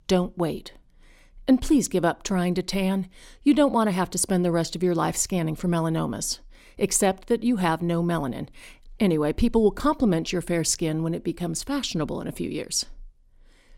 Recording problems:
none

